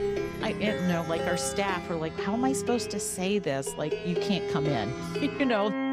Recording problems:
background music; loud; throughout; 3 dB below the speech

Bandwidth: 15.5 kHz